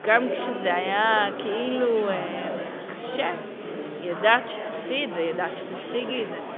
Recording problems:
phone-call audio; nothing above 3.5 kHz
murmuring crowd; loud; throughout; 7 dB below the speech

